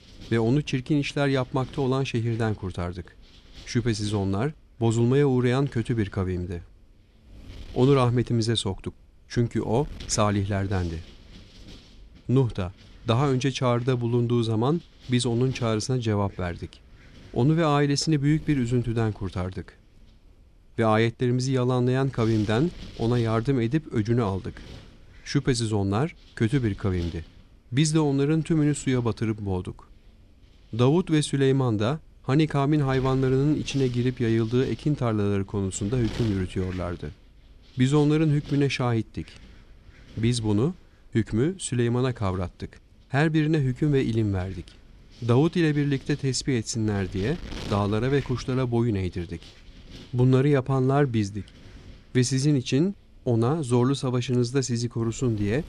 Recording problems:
wind noise on the microphone; occasional gusts; 20 dB below the speech

